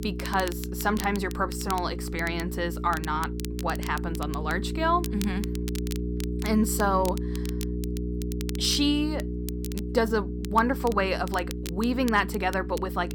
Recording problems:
electrical hum; noticeable; throughout; 60 Hz, 10 dB below the speech
crackle, like an old record; noticeable; 15 dB below the speech

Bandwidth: 17.5 kHz